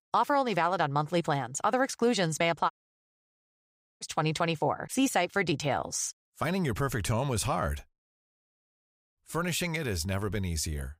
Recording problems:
audio cutting out; at 2.5 s for 1.5 s and at 8 s for 1.5 s

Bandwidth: 15.5 kHz